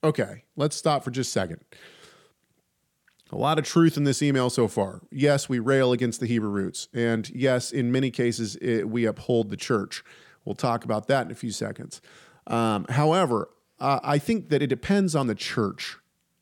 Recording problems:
none

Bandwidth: 17 kHz